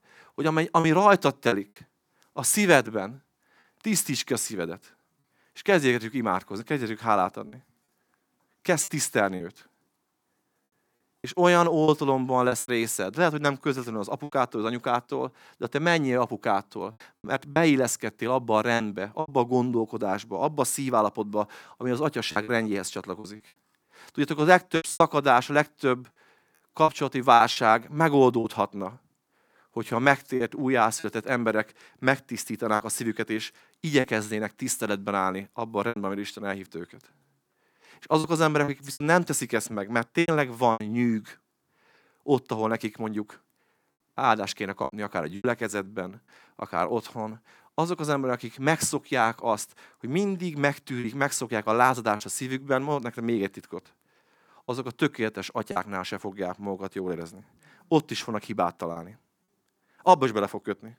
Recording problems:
choppy; occasionally; 5% of the speech affected

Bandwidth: 19 kHz